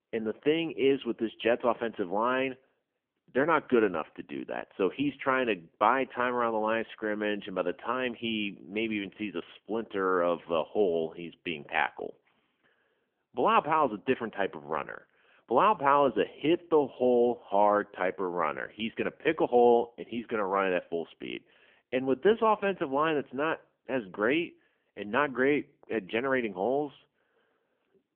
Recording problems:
phone-call audio; poor line; nothing above 3 kHz

